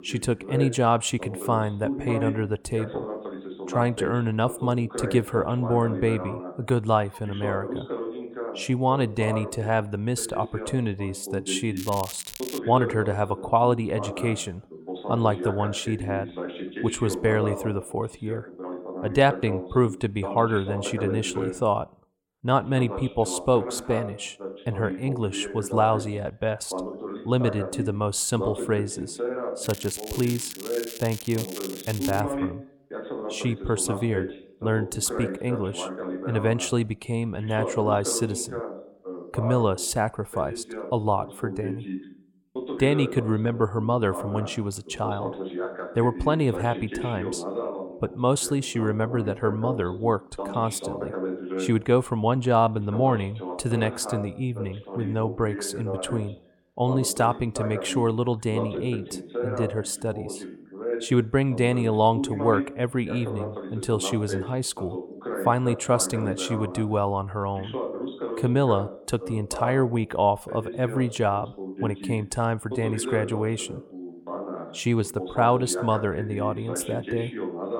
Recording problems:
voice in the background; loud; throughout; 8 dB below the speech
crackling; noticeable; at 12 s and from 30 to 32 s; 10 dB below the speech

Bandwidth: 17.5 kHz